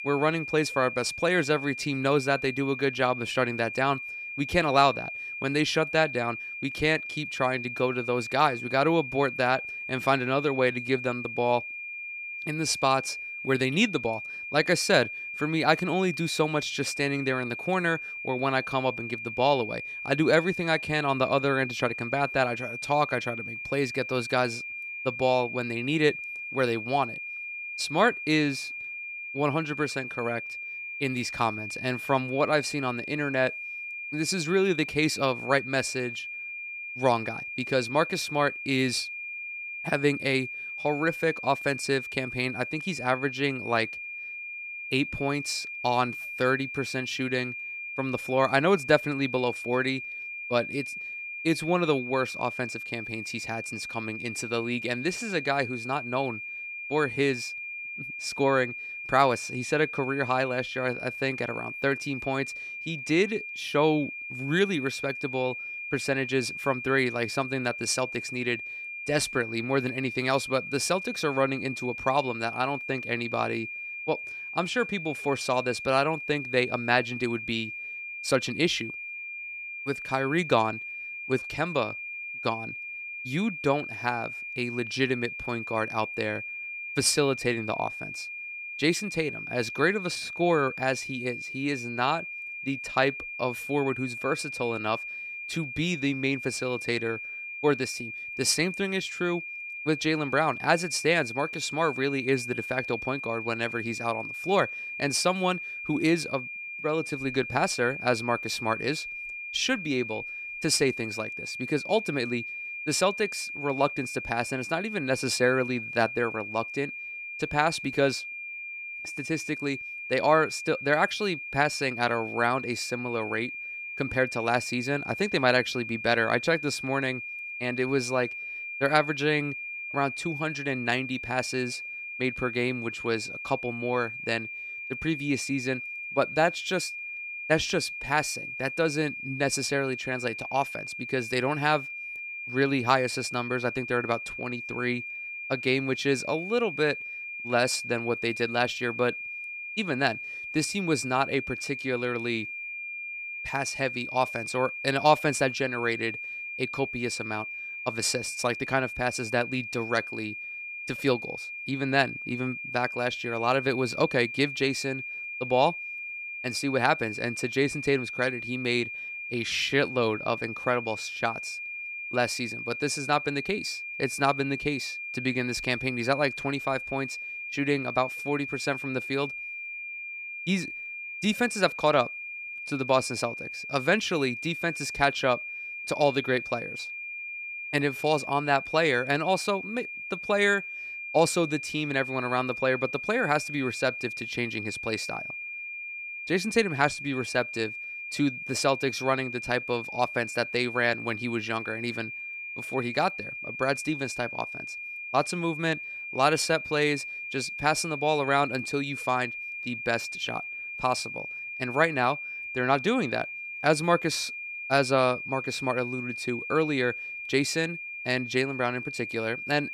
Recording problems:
high-pitched whine; loud; throughout; 2.5 kHz, 7 dB below the speech

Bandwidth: 14.5 kHz